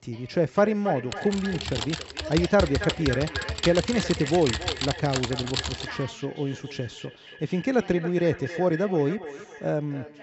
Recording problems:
echo of what is said; noticeable; throughout; 280 ms later, 10 dB below the speech
high frequencies cut off; noticeable; nothing above 7.5 kHz
voice in the background; noticeable; throughout; 20 dB below the speech
keyboard typing; noticeable; from 1 to 6 s; peak 2 dB below the speech

